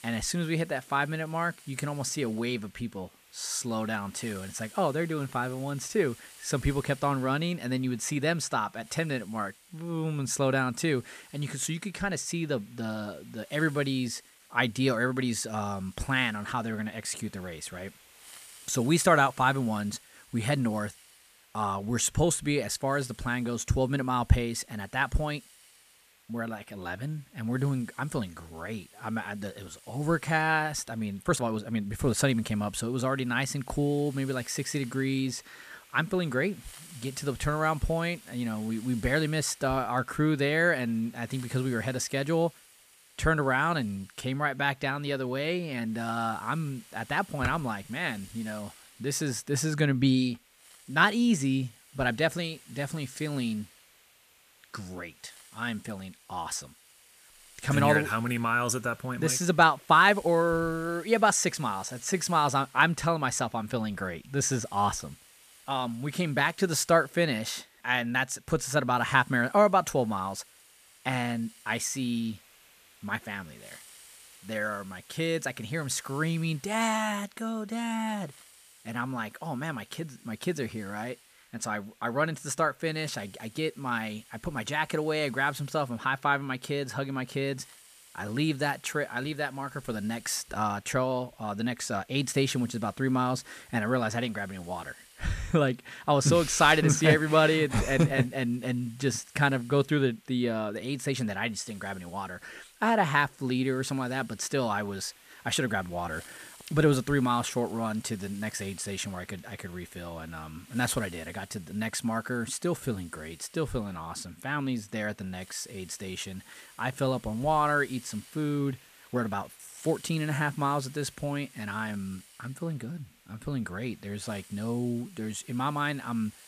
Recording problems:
hiss; faint; throughout; 25 dB below the speech
uneven, jittery; strongly; from 1 s to 2:00

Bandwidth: 14.5 kHz